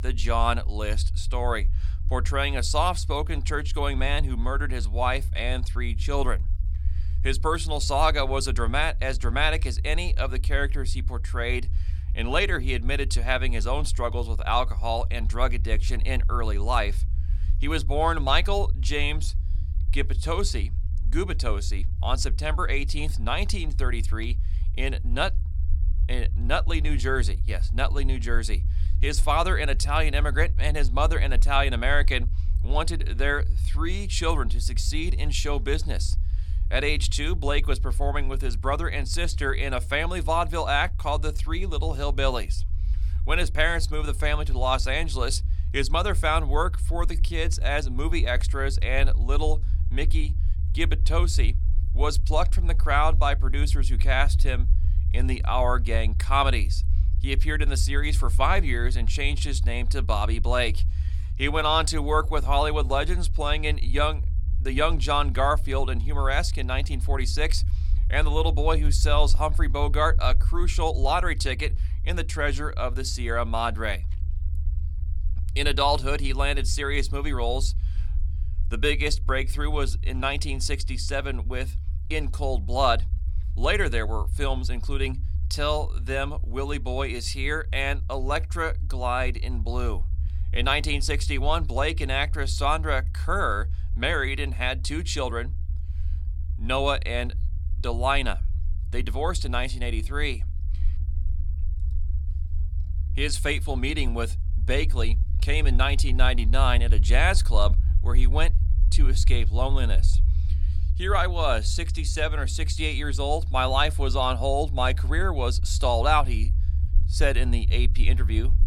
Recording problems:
low rumble; faint; throughout; 20 dB below the speech

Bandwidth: 17.5 kHz